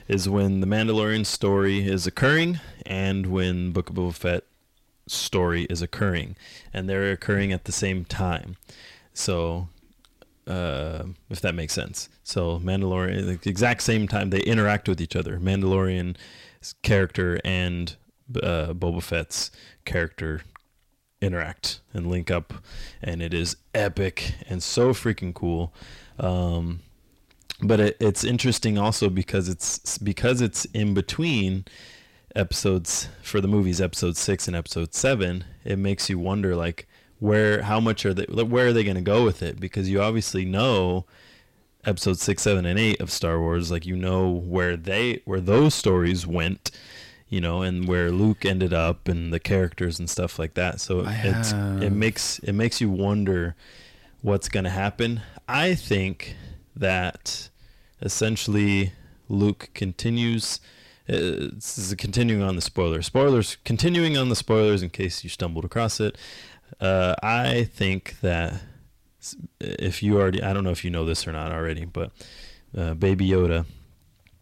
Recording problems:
distortion; slight; 10 dB below the speech

